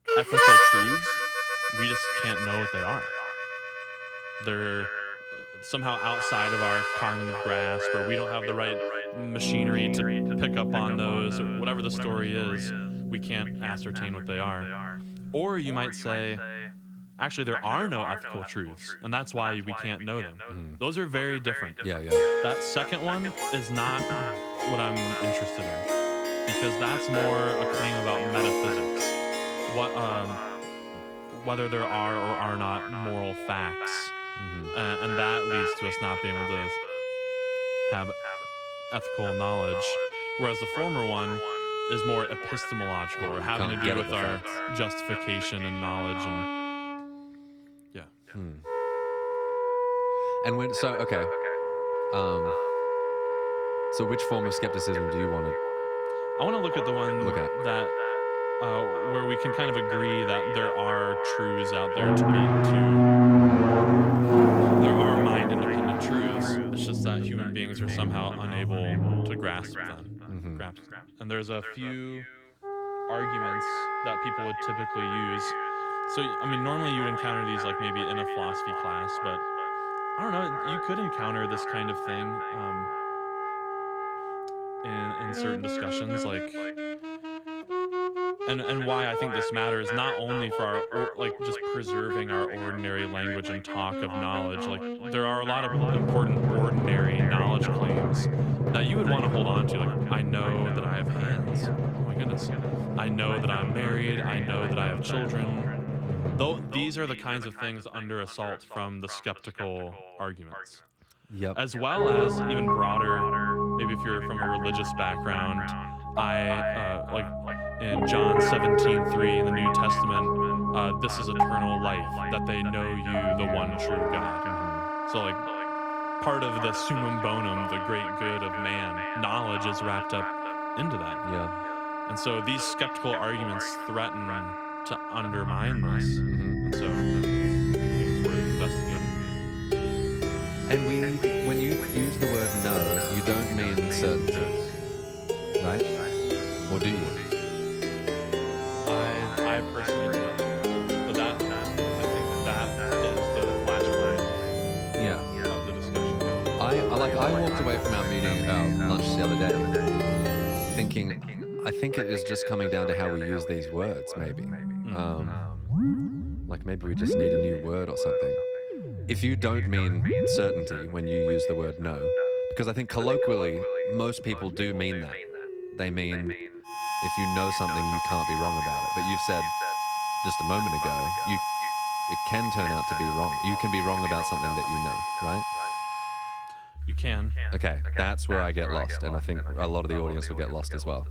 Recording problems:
echo of what is said; strong; throughout; 320 ms later, 8 dB below the speech
garbled, watery; slightly
background music; very loud; throughout; 4 dB above the speech

